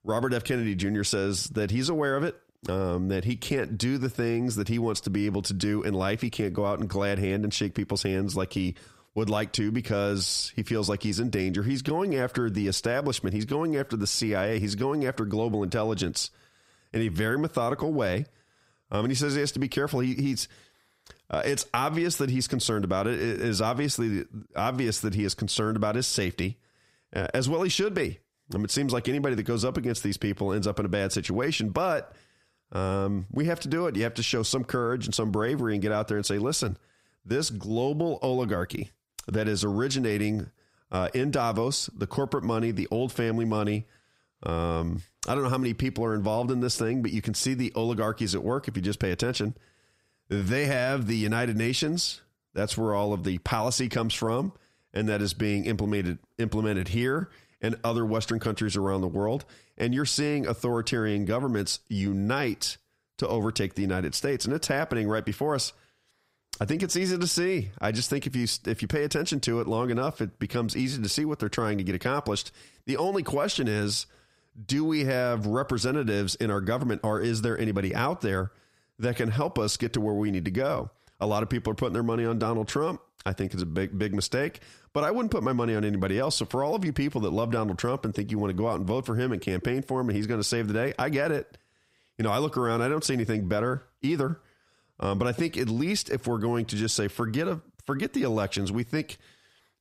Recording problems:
squashed, flat; heavily

